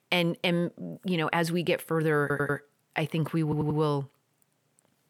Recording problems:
audio stuttering; at 2 s and at 3.5 s

